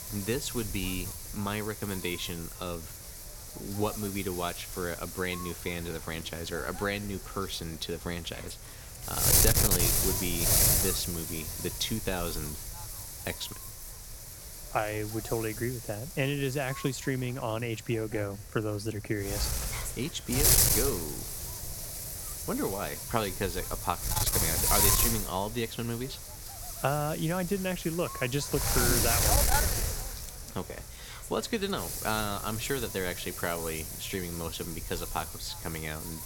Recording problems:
wind noise on the microphone; heavy; 1 dB above the speech

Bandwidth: 17.5 kHz